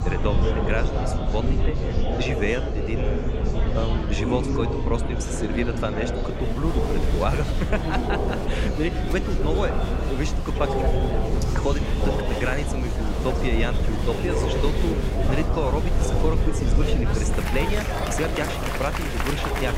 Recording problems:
murmuring crowd; very loud; throughout; as loud as the speech
low rumble; noticeable; throughout; 15 dB below the speech

